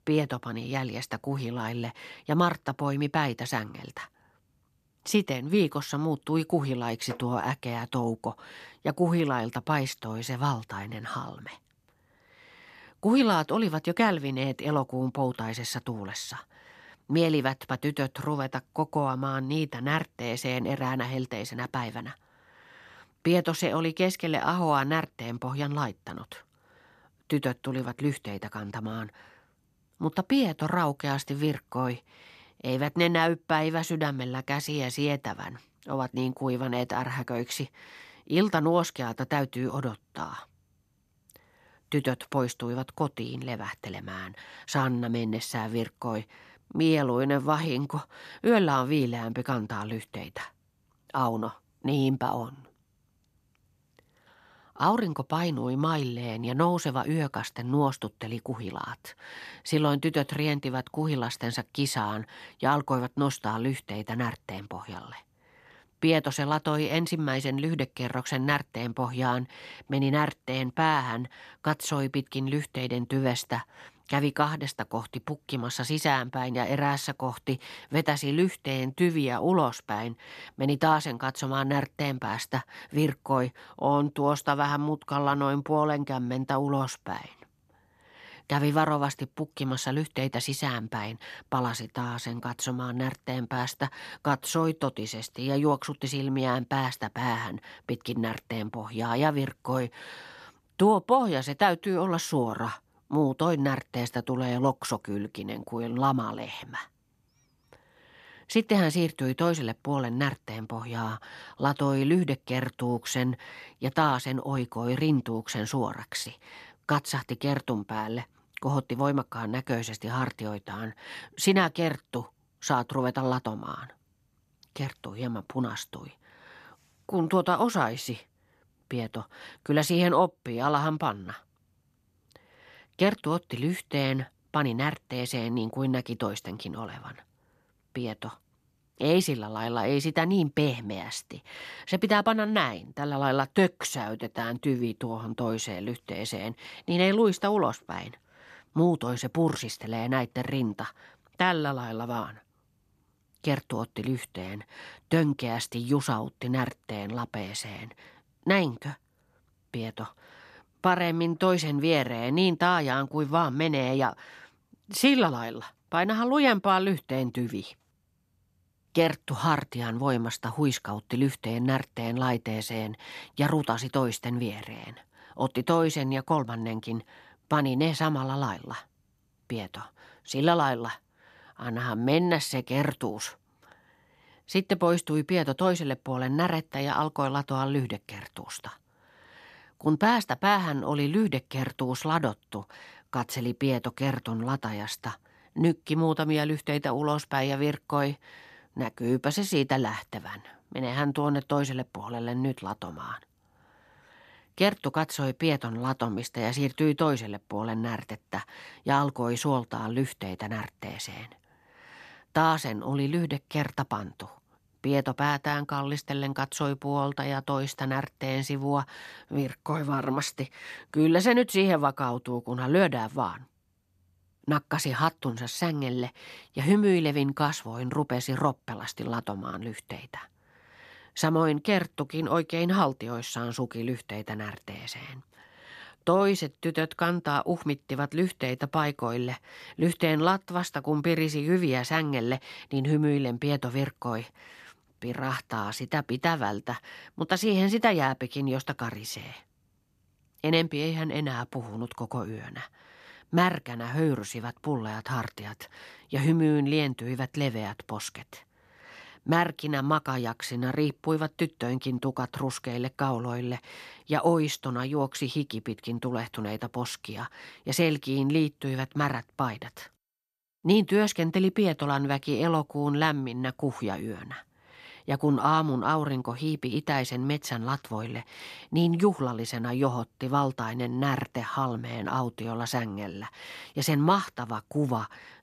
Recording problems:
none

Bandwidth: 14 kHz